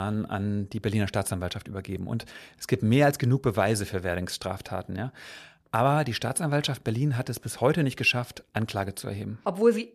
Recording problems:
abrupt cut into speech; at the start

